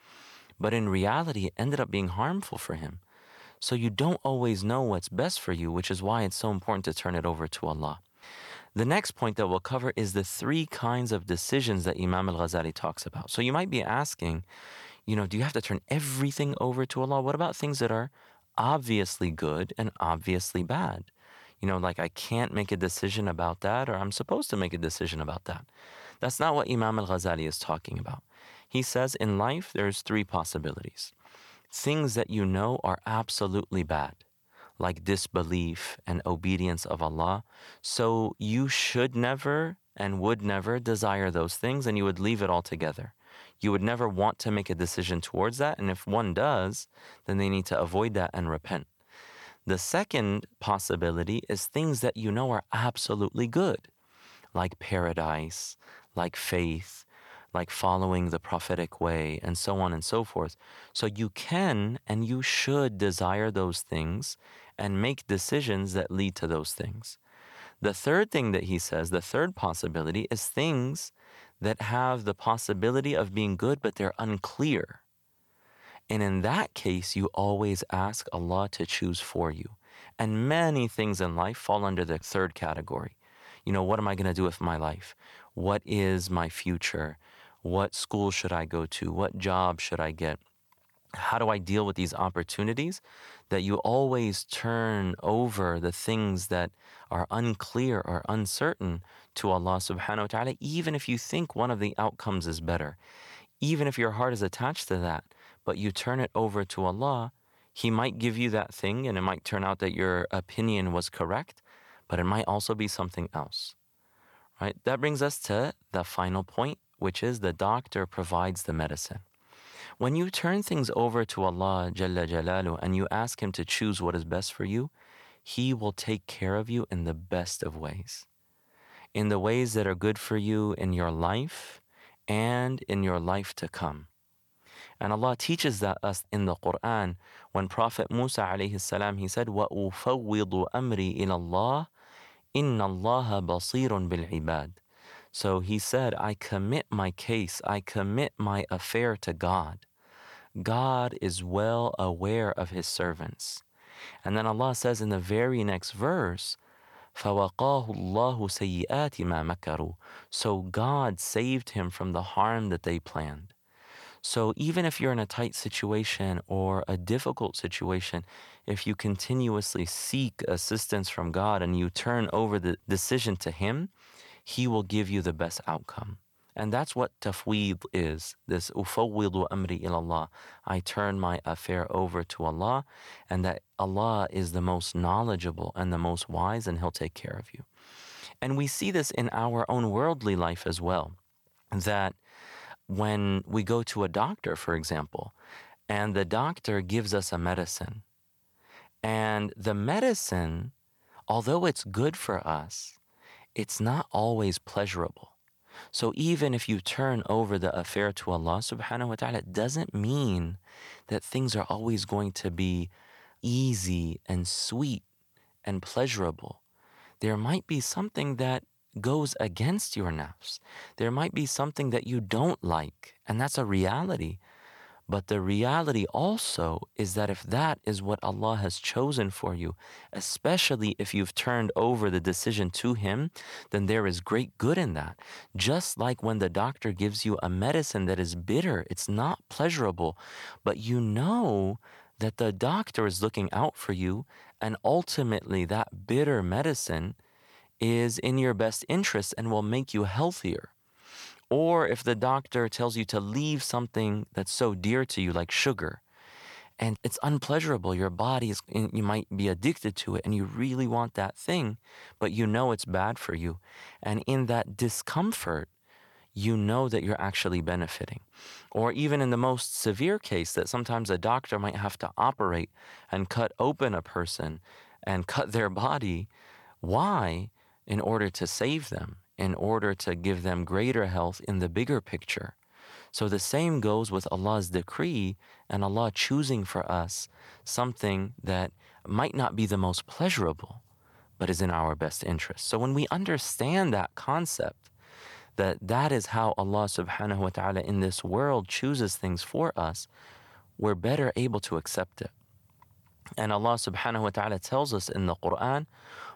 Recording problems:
none

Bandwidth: 18.5 kHz